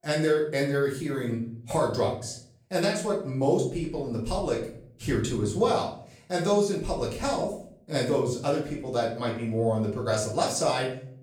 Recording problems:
off-mic speech; far
room echo; slight; dies away in 0.5 s

